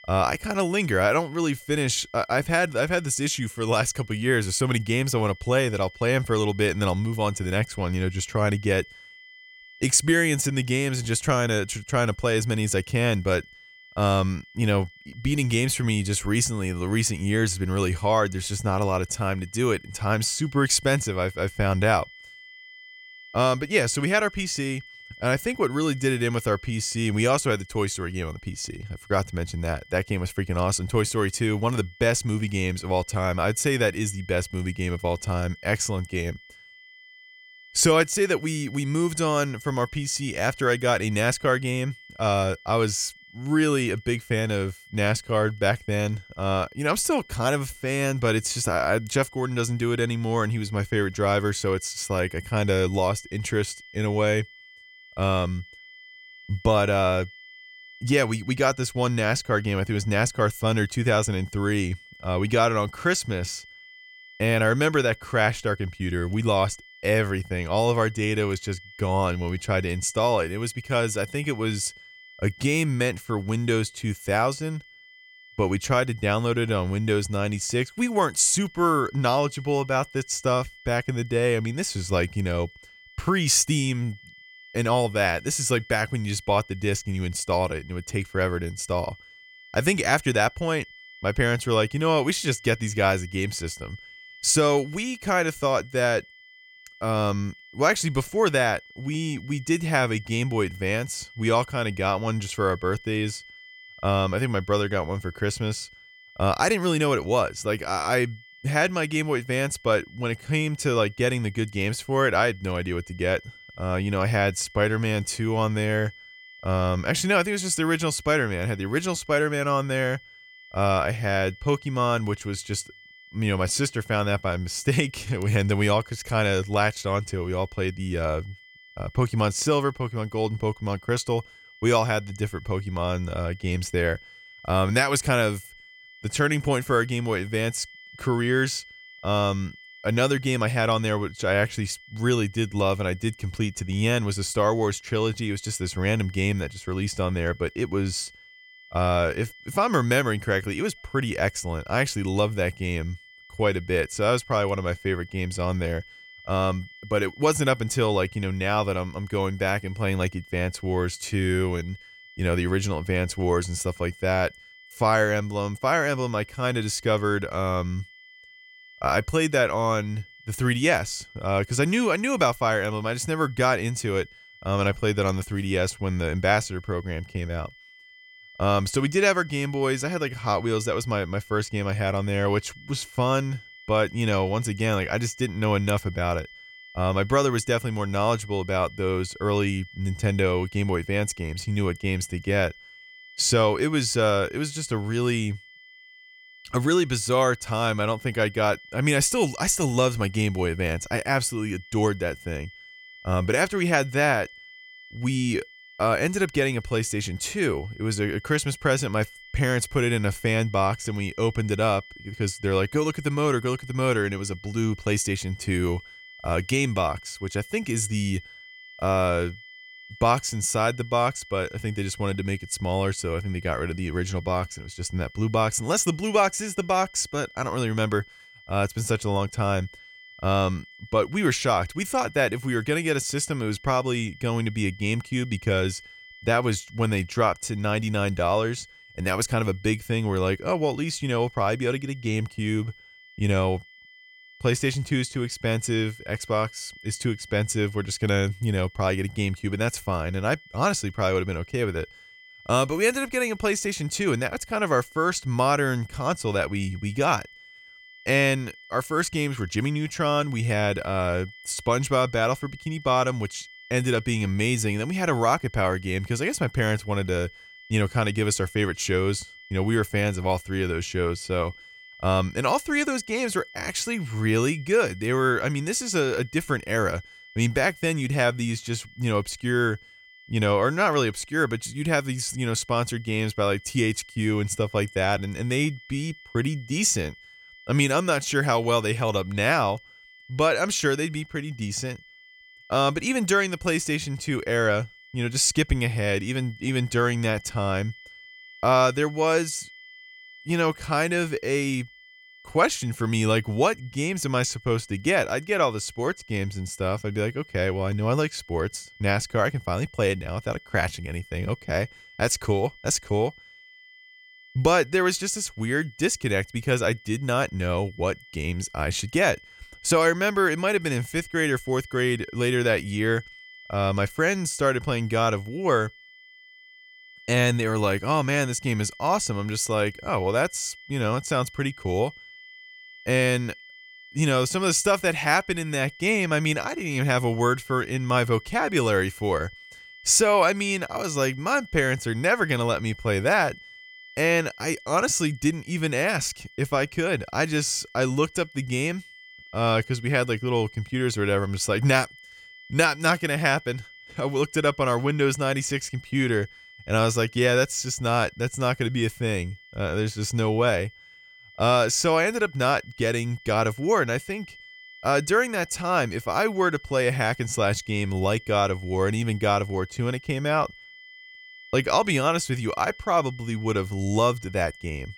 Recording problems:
high-pitched whine; faint; throughout; 2 kHz, 20 dB below the speech

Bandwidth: 18 kHz